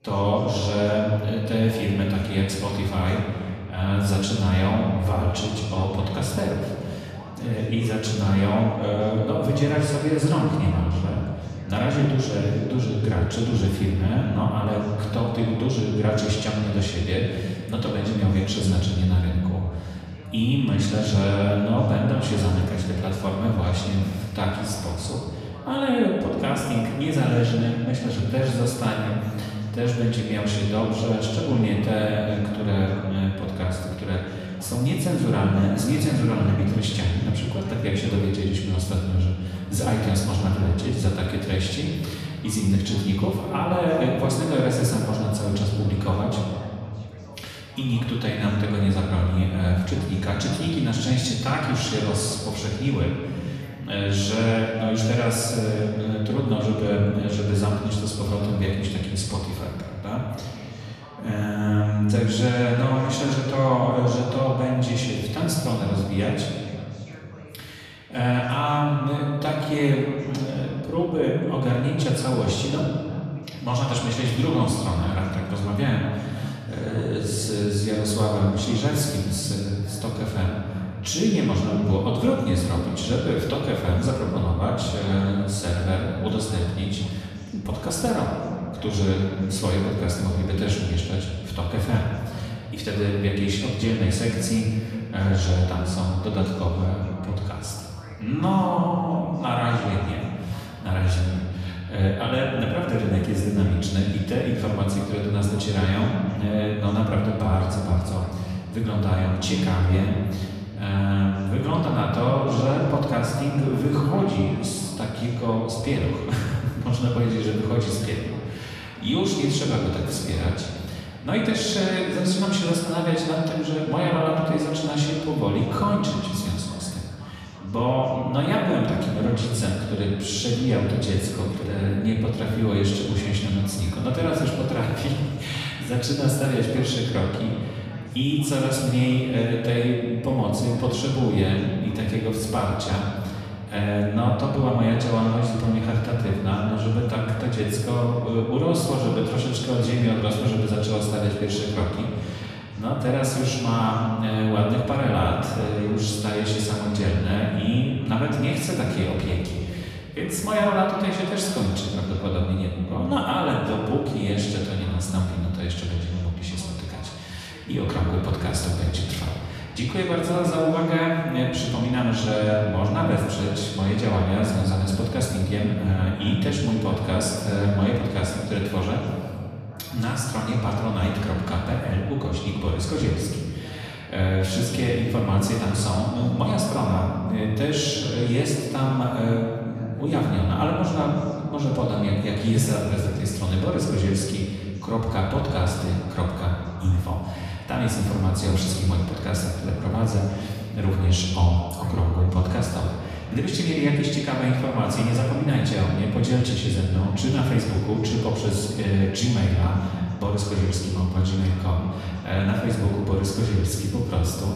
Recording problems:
off-mic speech; far
room echo; noticeable; dies away in 2.2 s
voice in the background; faint; throughout; 20 dB below the speech

